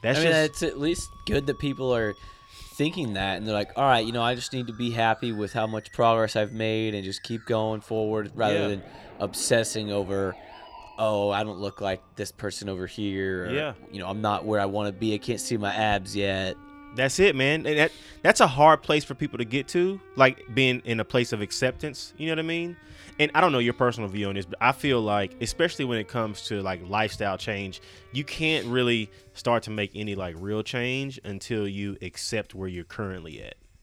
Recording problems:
background music; faint; throughout; 25 dB below the speech

